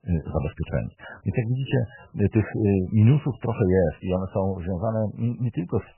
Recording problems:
garbled, watery; badly; nothing above 3 kHz

